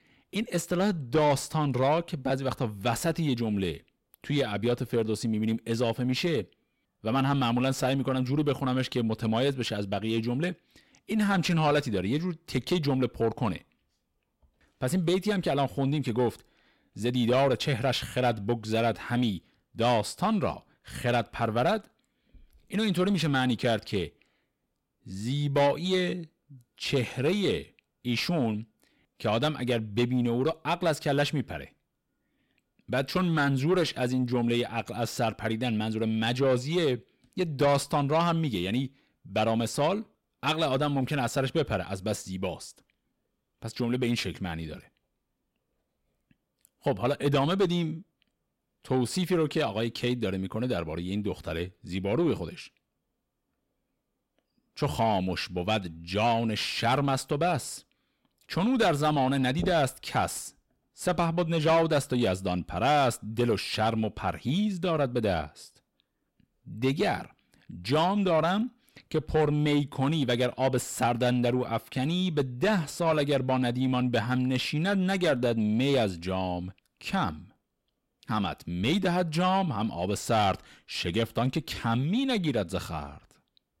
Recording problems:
distortion; slight; 10 dB below the speech

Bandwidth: 16 kHz